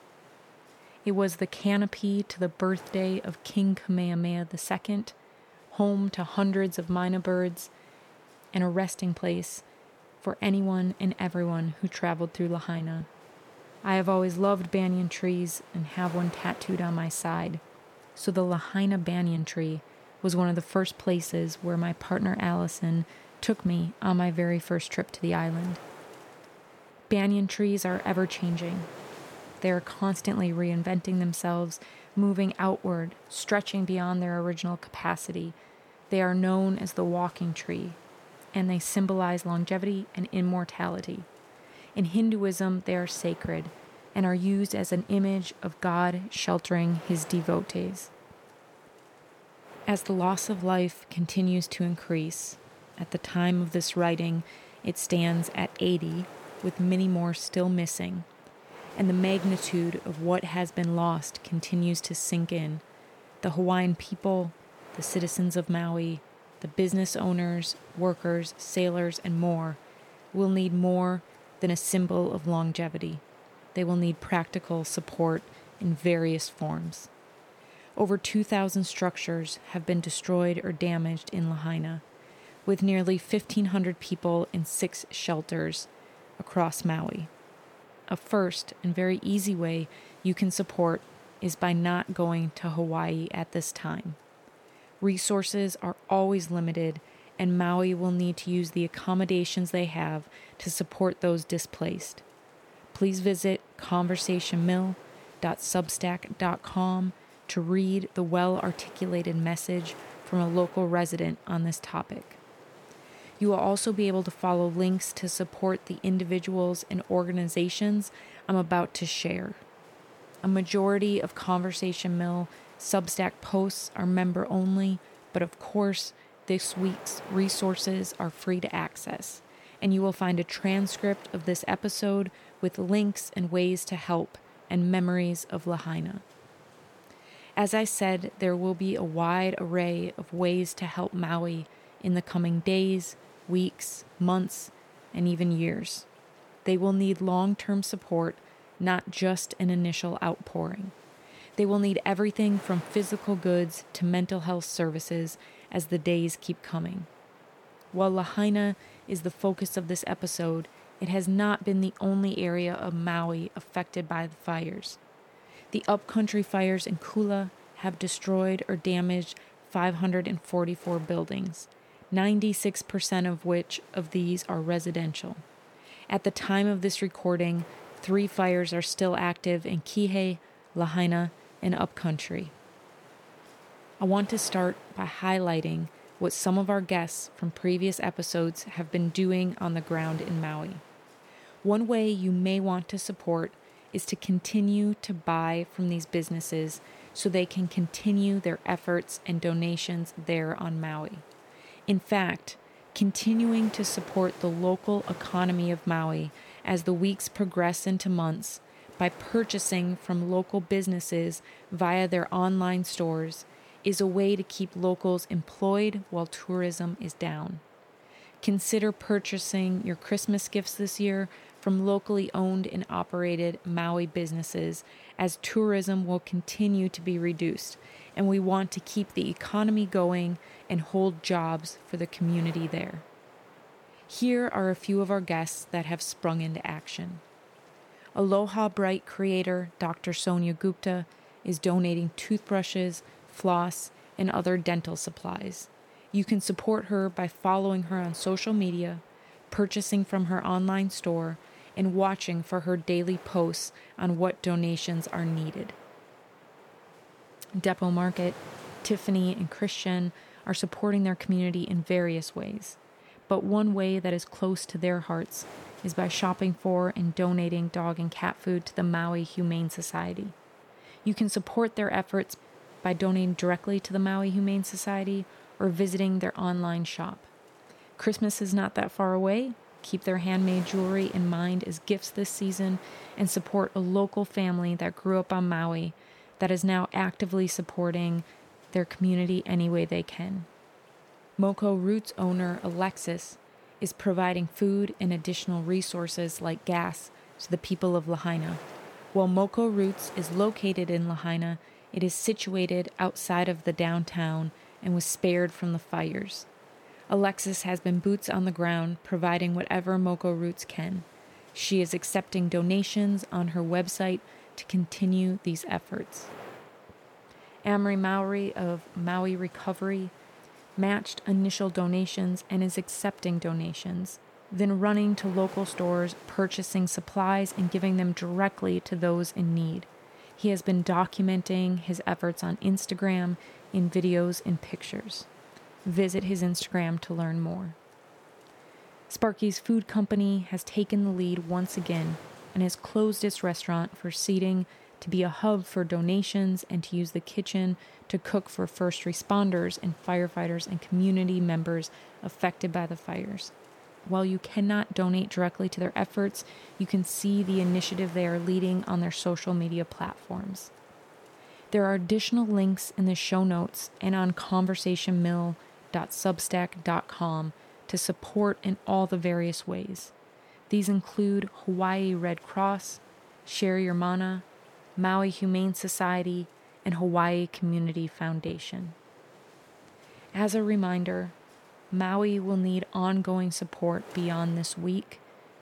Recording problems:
wind noise on the microphone; occasional gusts; 20 dB below the speech

